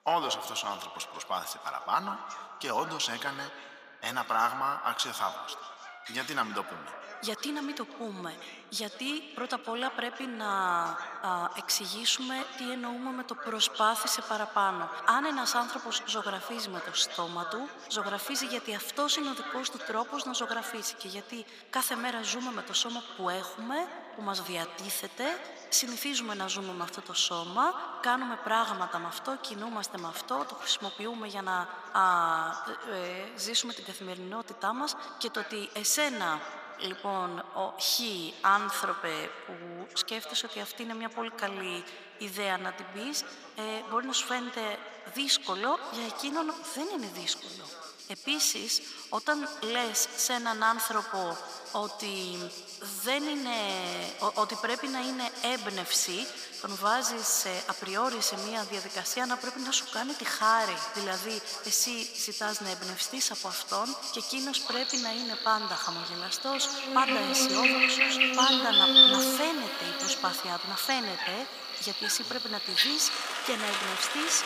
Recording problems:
echo of what is said; strong; throughout; 140 ms later, 10 dB below the speech
thin; very; fading below 550 Hz
animal sounds; very loud; throughout; 2 dB above the speech
voice in the background; noticeable; throughout; 15 dB below the speech

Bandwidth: 15 kHz